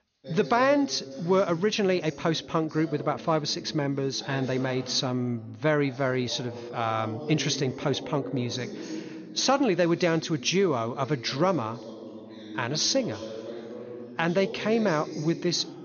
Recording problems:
high frequencies cut off; noticeable; nothing above 6.5 kHz
voice in the background; noticeable; throughout; 15 dB below the speech

